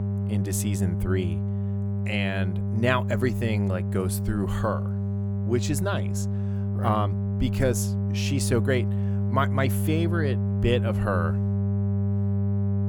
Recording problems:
electrical hum; loud; throughout; 50 Hz, 8 dB below the speech

